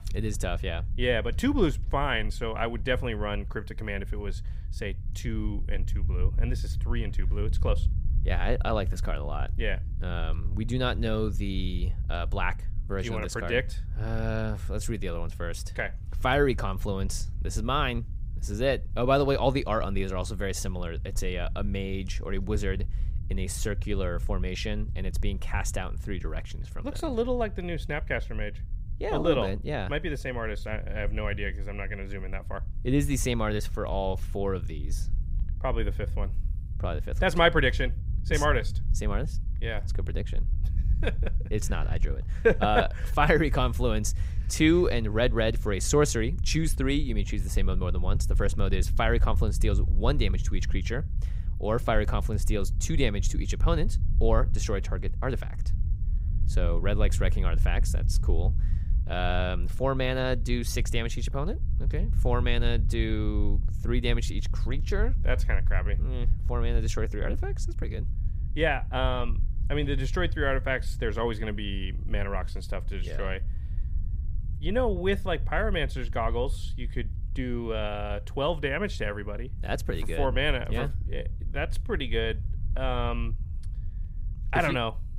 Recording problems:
low rumble; faint; throughout; 20 dB below the speech

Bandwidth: 15.5 kHz